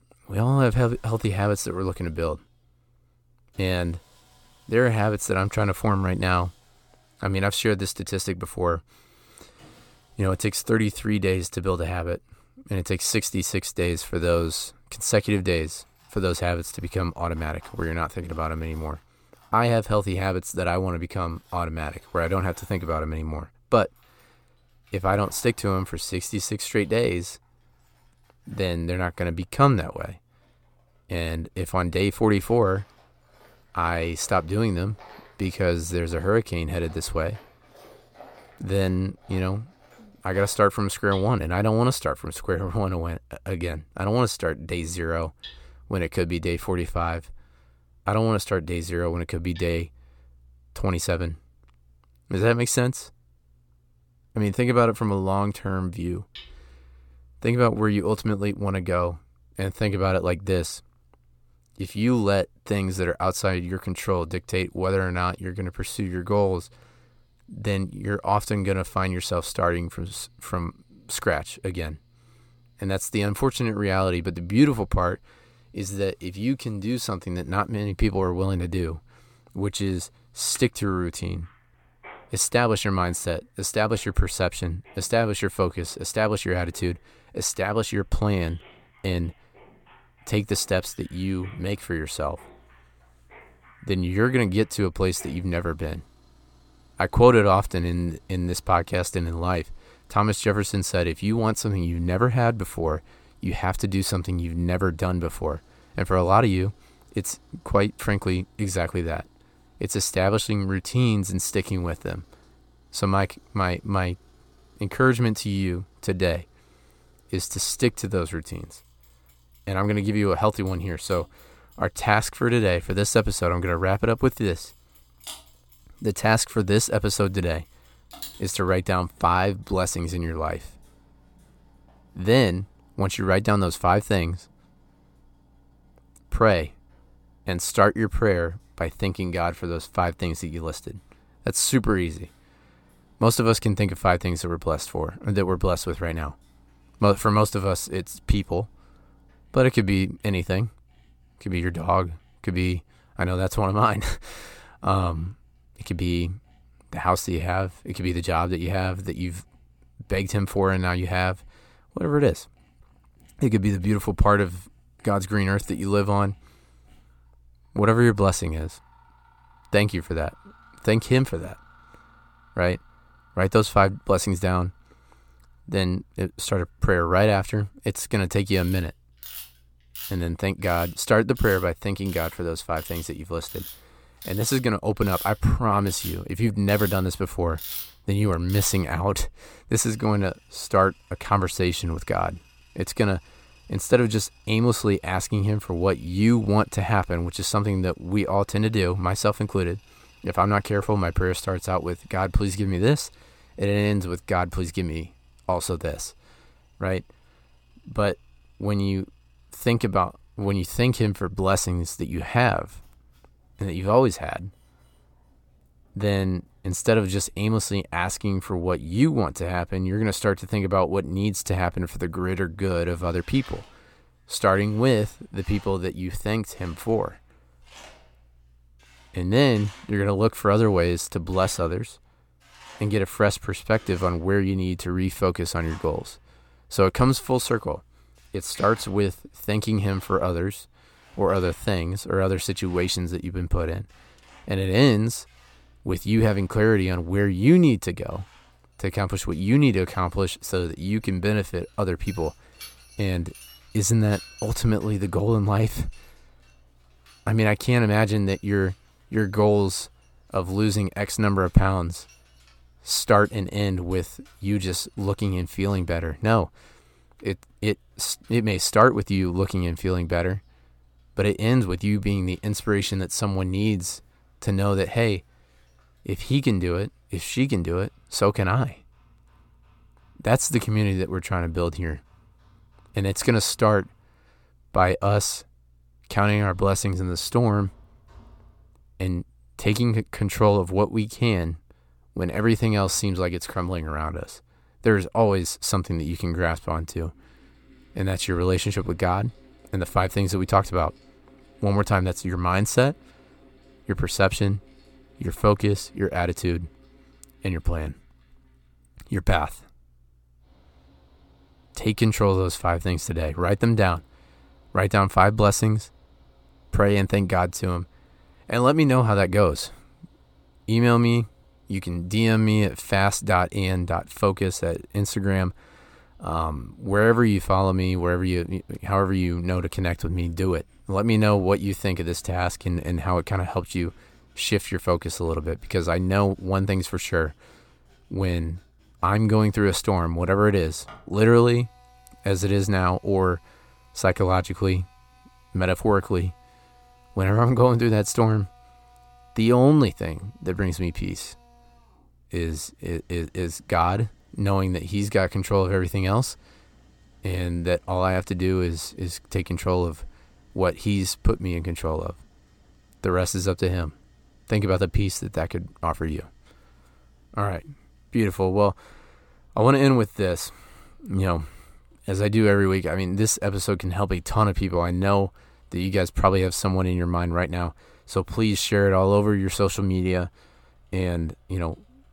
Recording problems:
machinery noise; faint; throughout; 25 dB below the speech

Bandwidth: 18 kHz